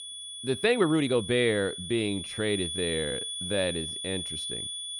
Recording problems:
high-pitched whine; loud; throughout; 3.5 kHz, 6 dB below the speech
uneven, jittery; strongly; from 0.5 to 4 s

